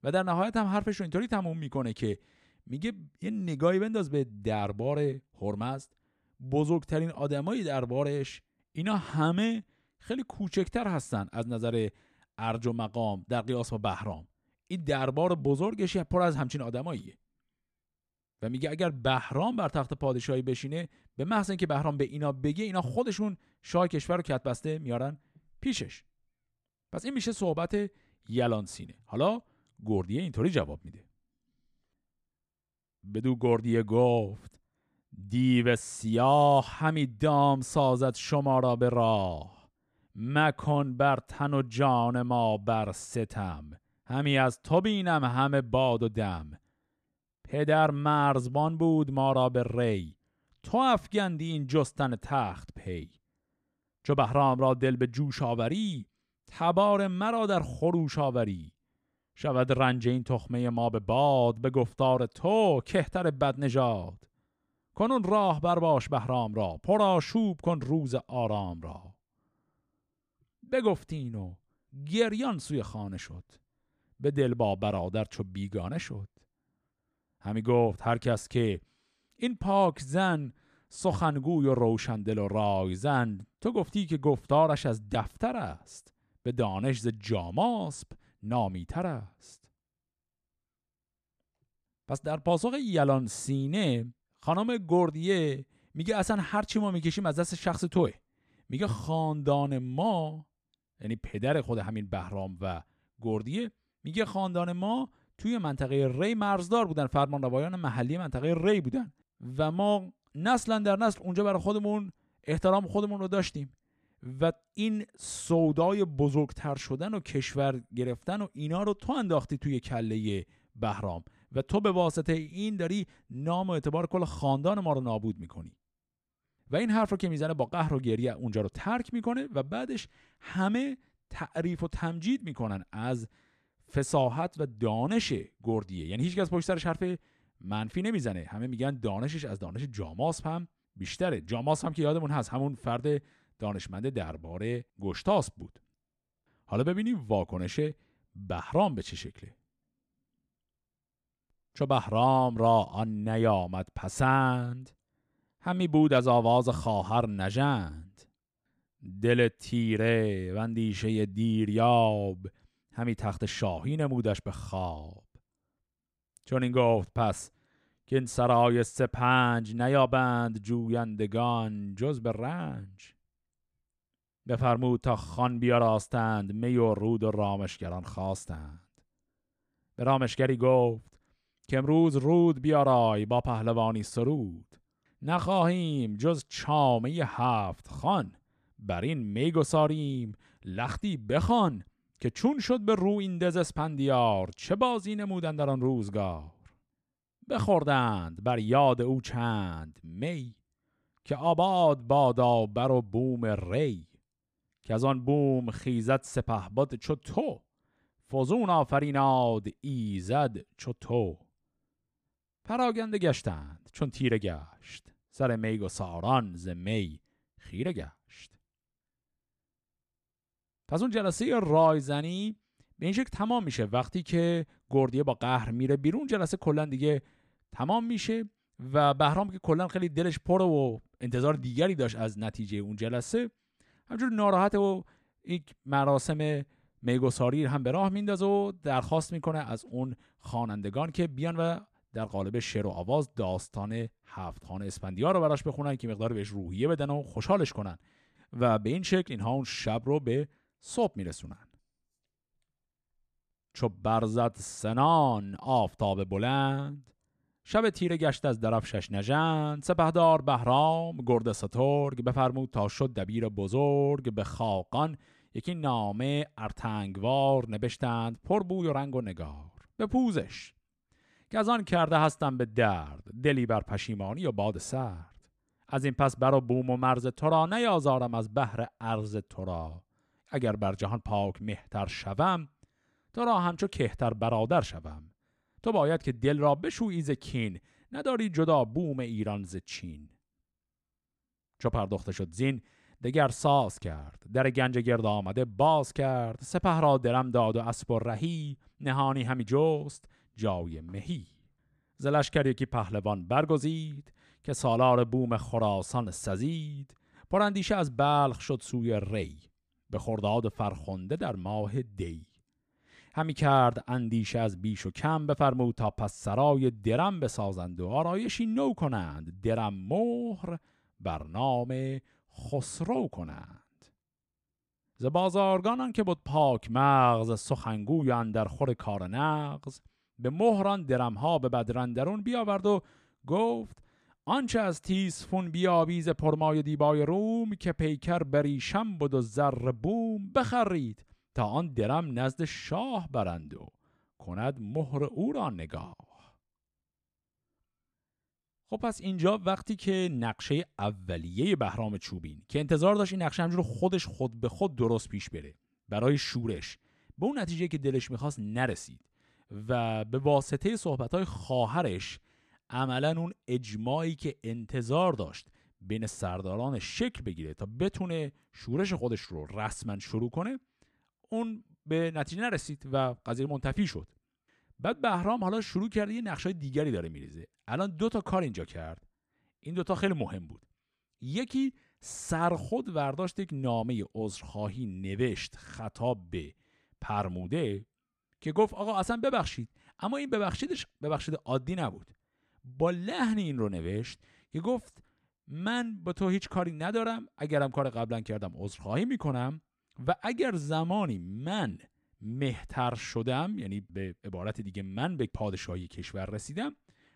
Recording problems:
none

